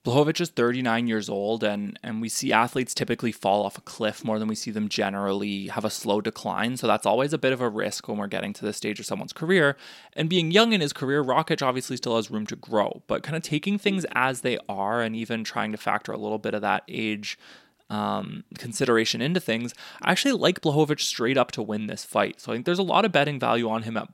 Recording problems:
none

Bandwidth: 16.5 kHz